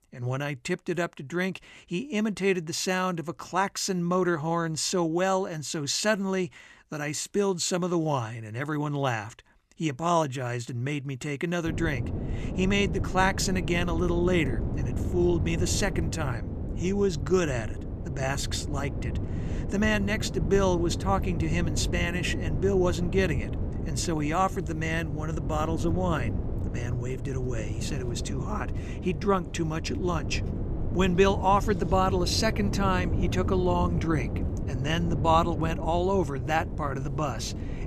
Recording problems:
wind noise on the microphone; occasional gusts; from 12 s on; 10 dB below the speech

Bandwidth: 14 kHz